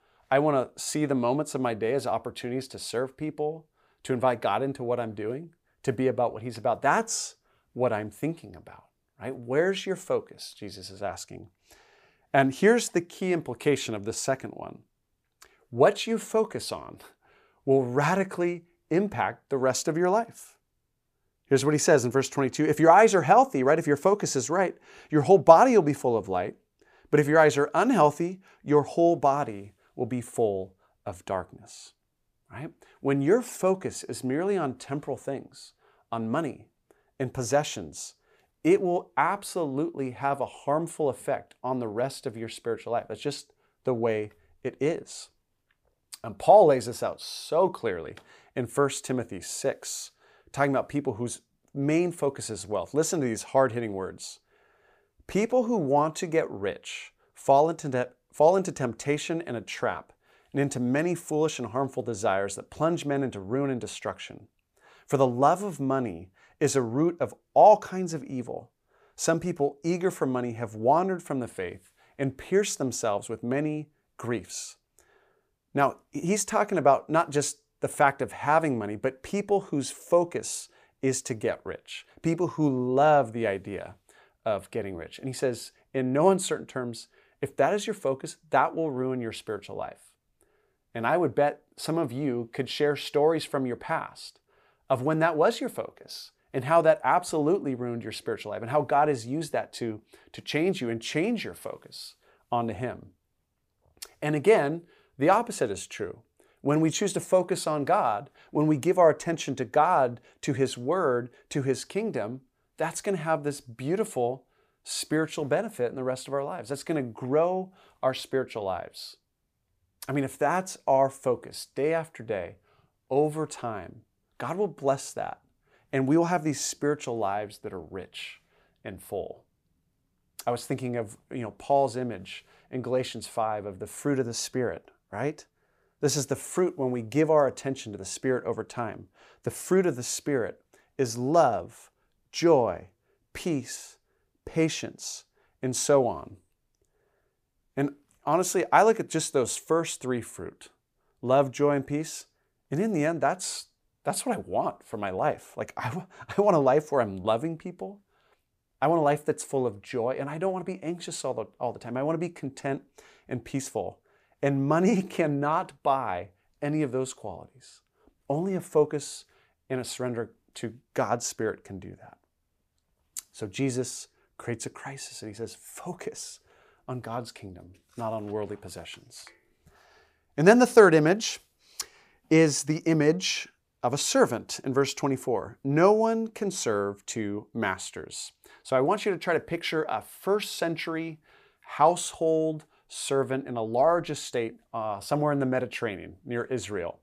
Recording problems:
none

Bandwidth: 15 kHz